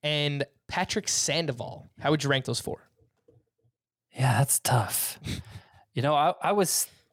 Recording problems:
none

